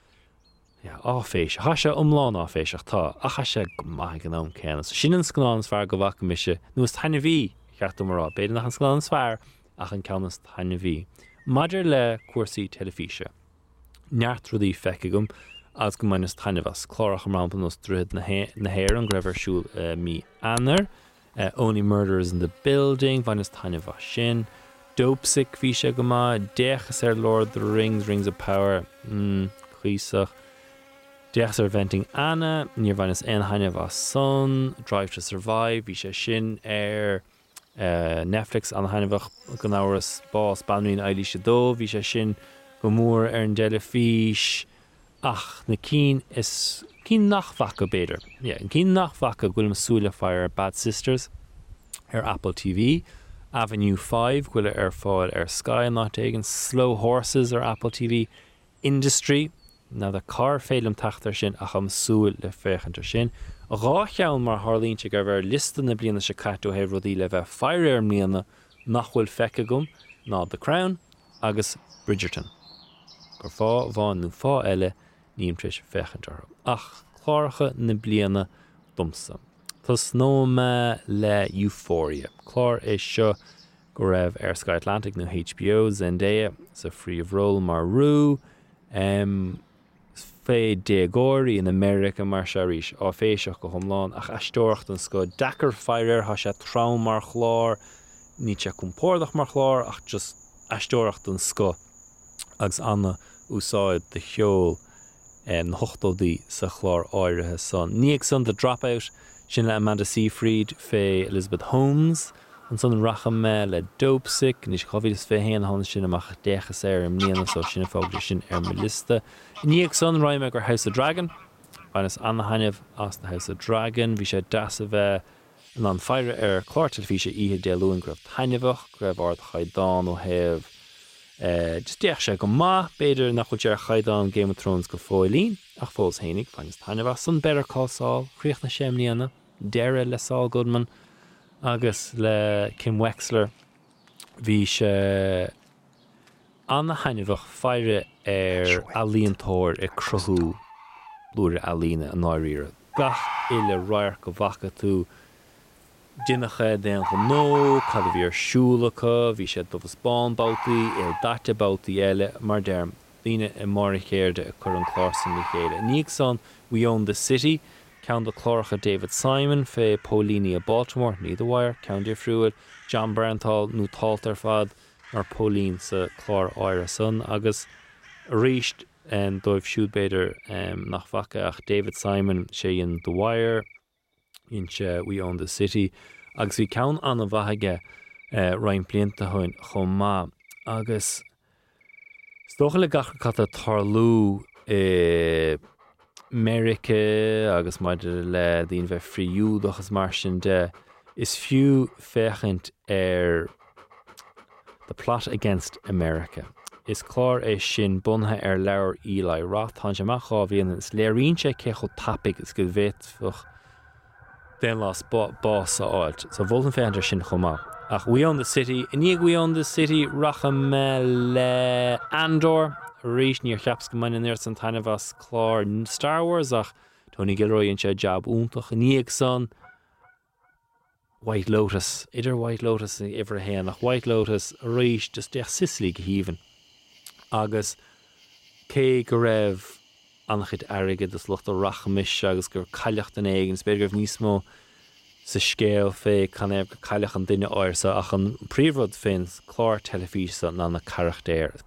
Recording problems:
animal sounds; noticeable; throughout; 15 dB below the speech

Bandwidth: 16 kHz